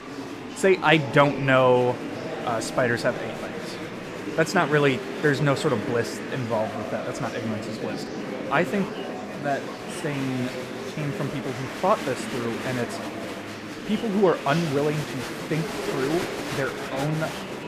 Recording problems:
murmuring crowd; loud; throughout; 7 dB below the speech

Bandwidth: 14.5 kHz